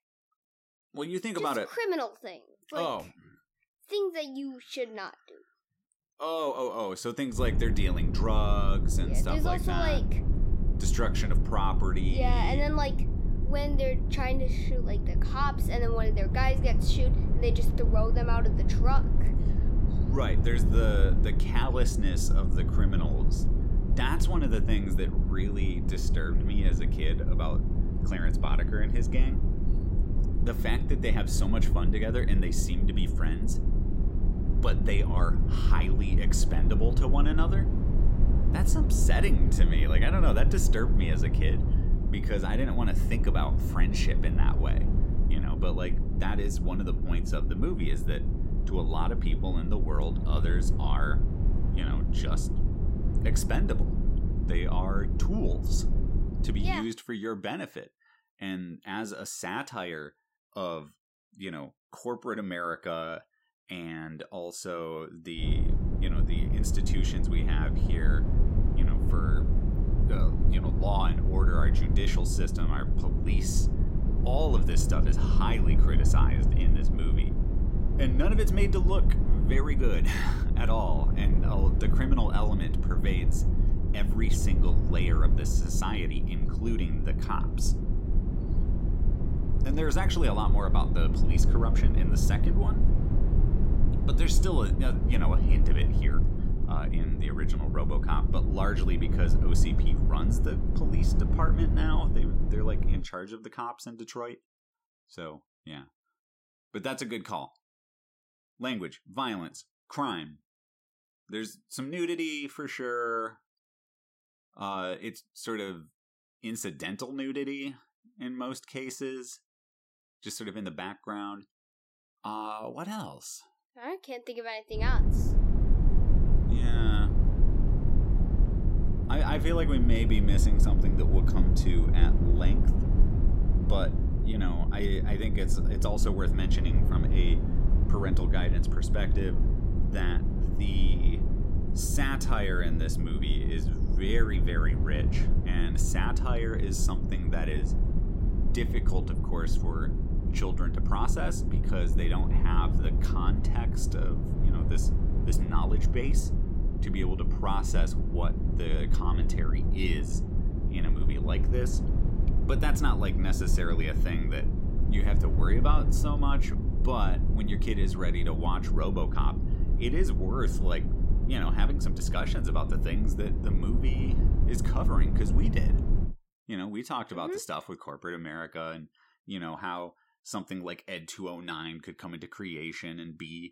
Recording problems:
low rumble; loud; from 7.5 to 57 s, from 1:05 to 1:43 and from 2:05 to 2:56; 6 dB below the speech

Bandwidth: 16 kHz